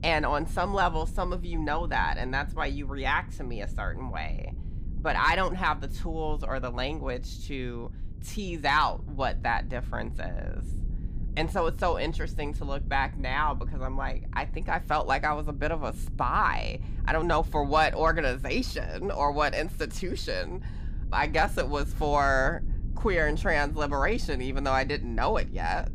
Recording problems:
low rumble; faint; throughout; 25 dB below the speech

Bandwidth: 15.5 kHz